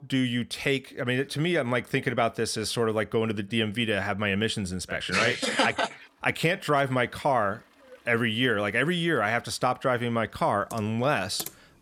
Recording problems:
household noises; noticeable; from 6 s on; 15 dB below the speech

